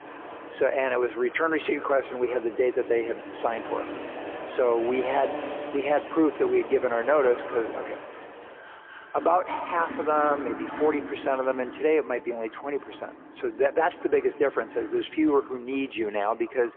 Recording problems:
phone-call audio; poor line; nothing above 3.5 kHz
echo of what is said; faint; throughout; 180 ms later, 20 dB below the speech
traffic noise; noticeable; throughout; 10 dB below the speech

